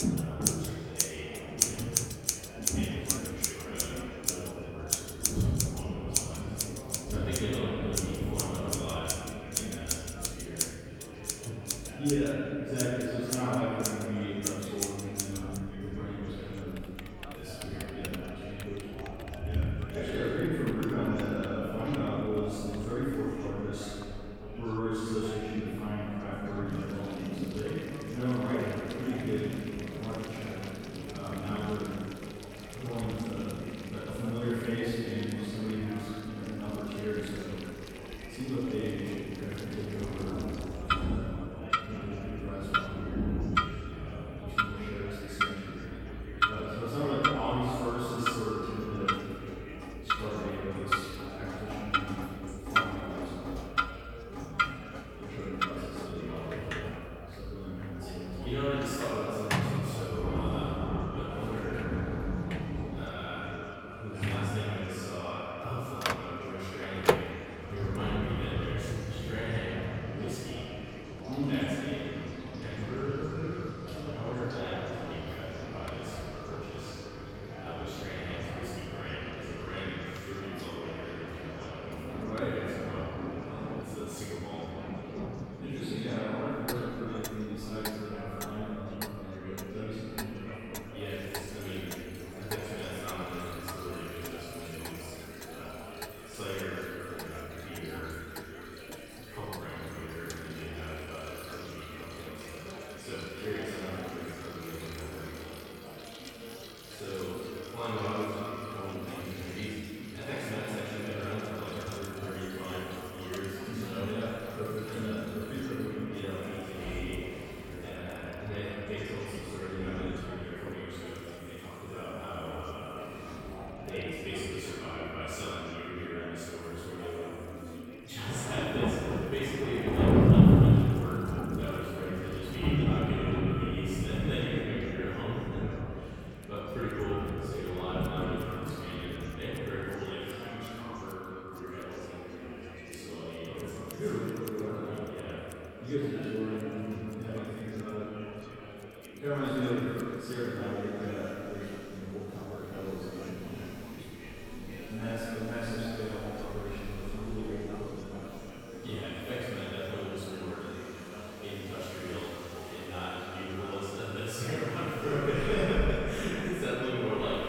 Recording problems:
room echo; strong; dies away in 2.3 s
off-mic speech; far
echo of what is said; noticeable; from 46 s on; 300 ms later, 15 dB below the speech
rain or running water; very loud; throughout; 1 dB above the speech
household noises; loud; throughout; 1 dB below the speech
chatter from many people; loud; throughout; 10 dB below the speech

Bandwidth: 17 kHz